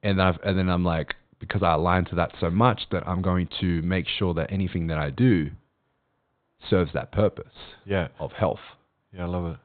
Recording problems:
high frequencies cut off; severe; nothing above 4 kHz

